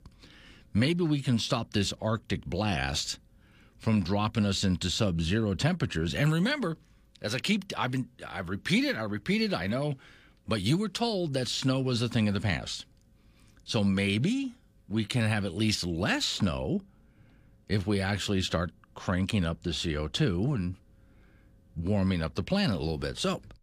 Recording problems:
none

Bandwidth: 15 kHz